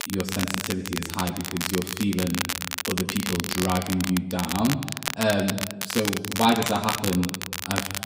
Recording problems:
off-mic speech; far
room echo; noticeable; dies away in 1.1 s
crackle, like an old record; loud; 3 dB below the speech

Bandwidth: 15.5 kHz